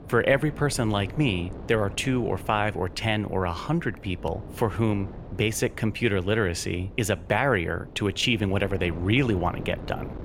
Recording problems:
wind noise on the microphone; occasional gusts; 20 dB below the speech

